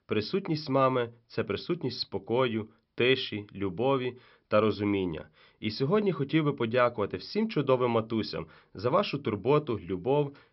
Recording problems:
high frequencies cut off; noticeable; nothing above 5.5 kHz

